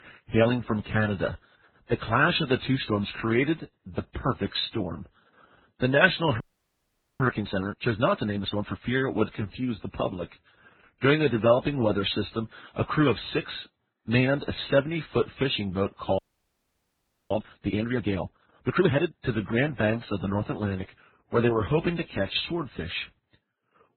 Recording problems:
garbled, watery; badly; nothing above 4 kHz
audio freezing; at 6.5 s for 1 s and at 16 s for 1 s

